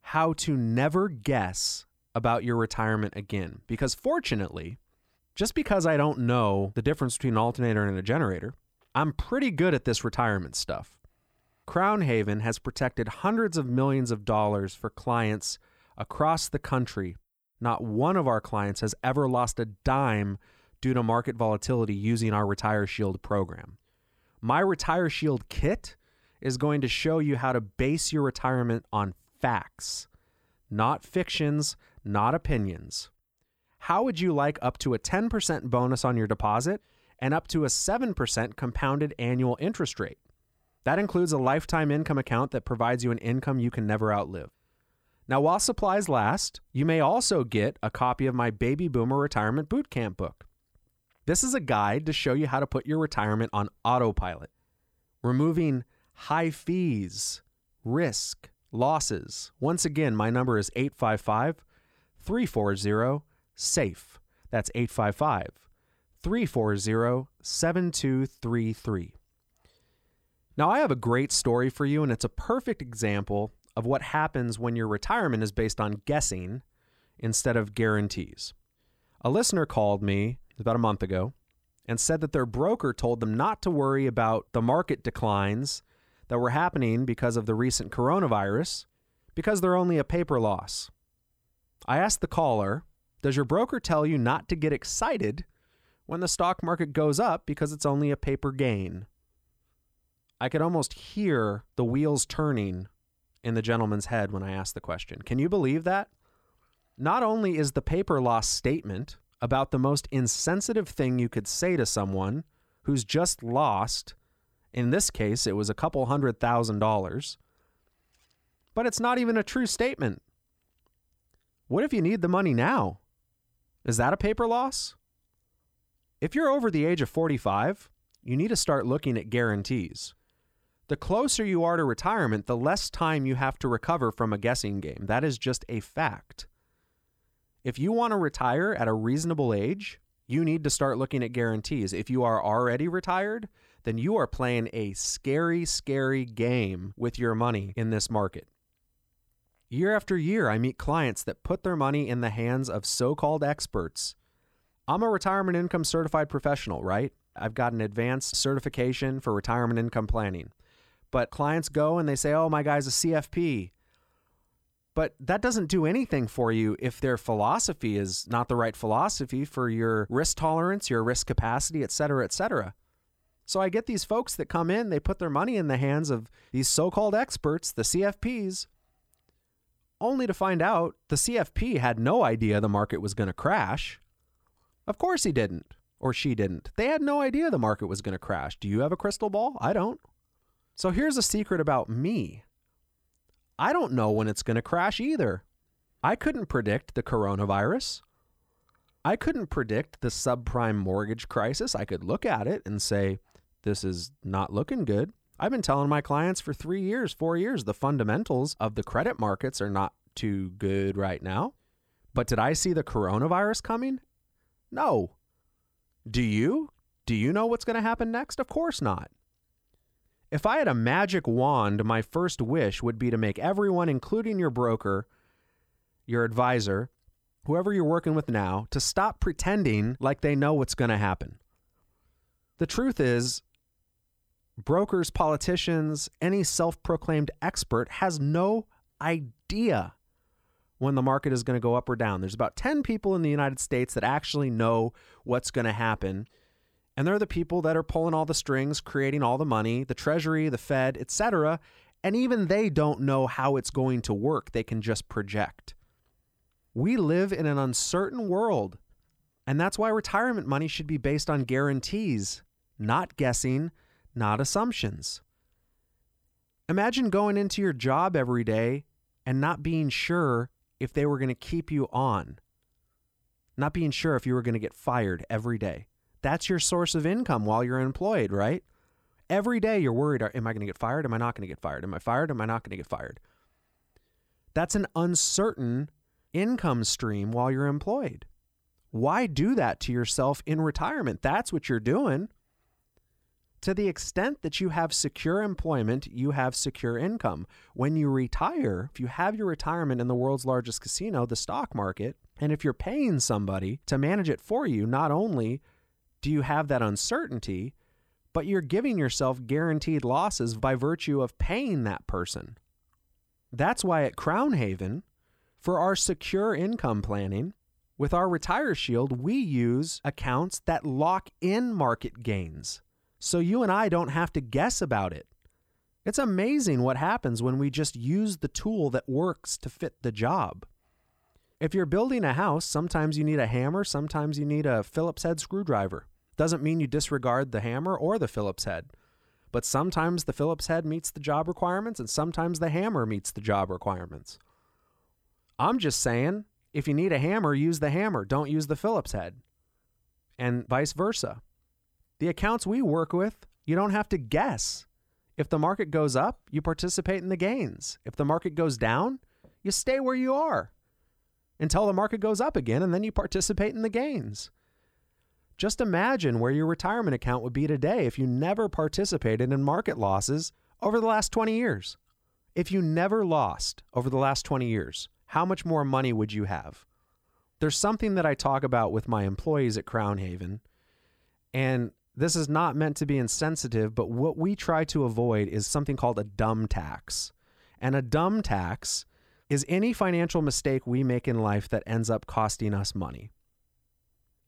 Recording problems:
none

